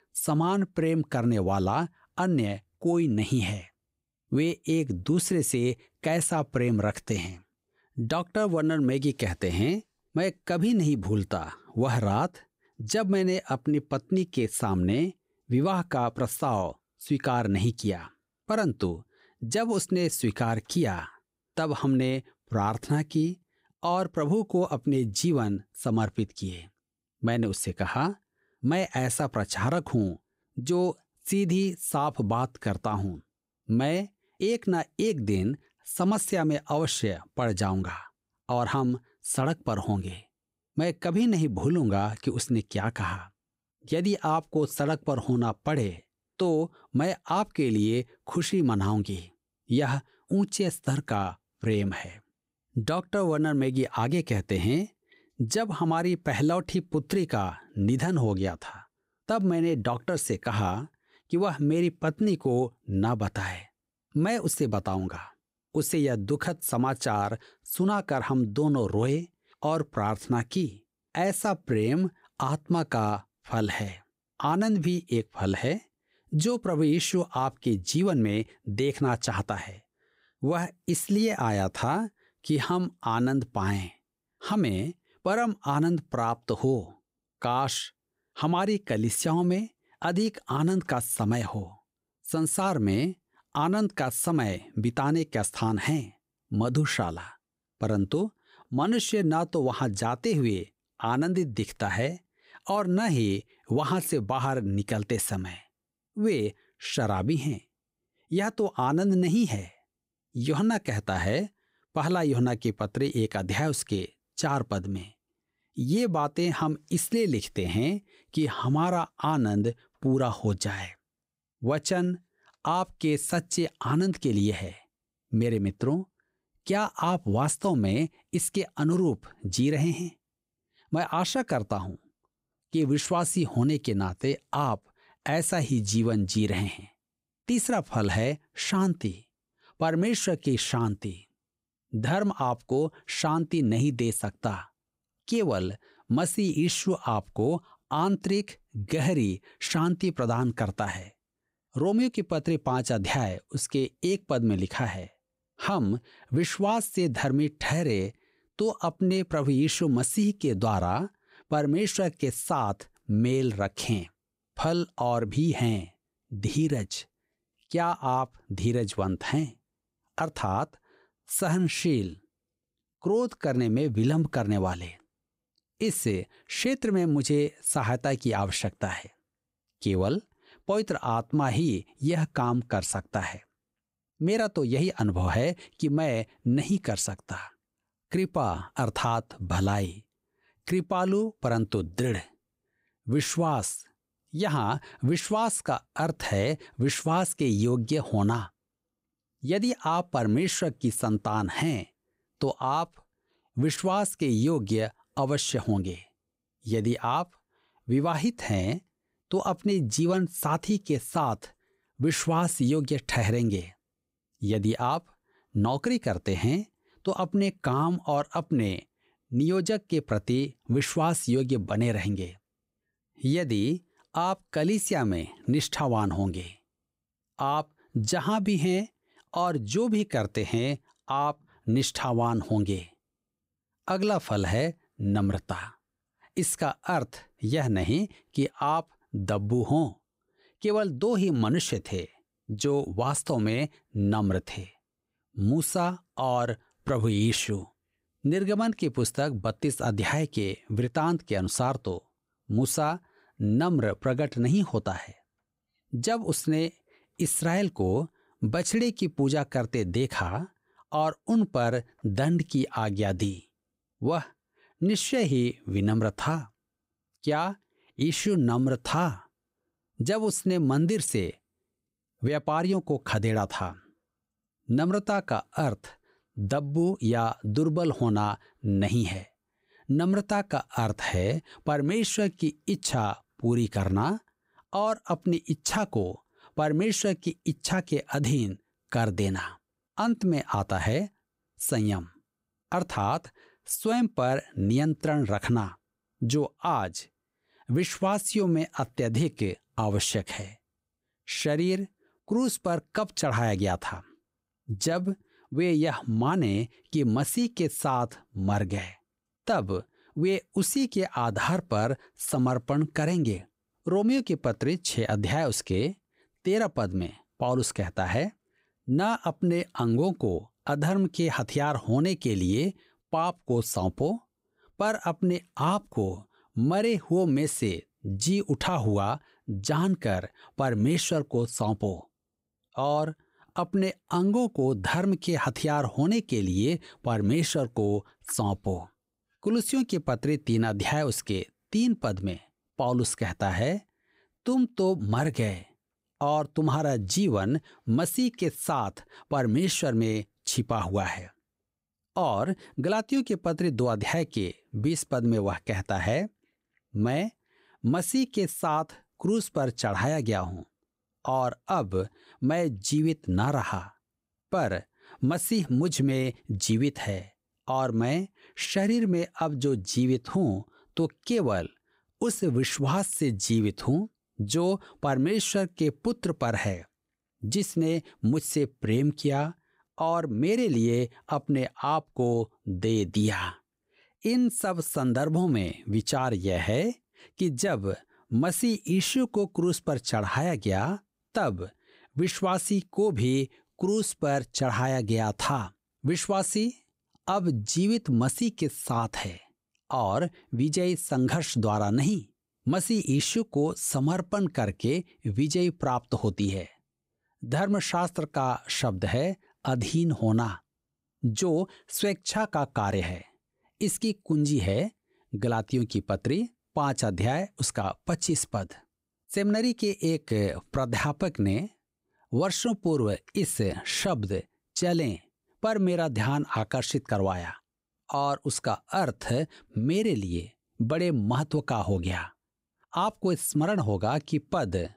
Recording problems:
none

